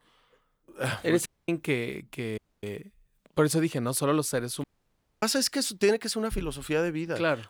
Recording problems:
audio cutting out; at 1.5 s, at 2.5 s and at 4.5 s for 0.5 s

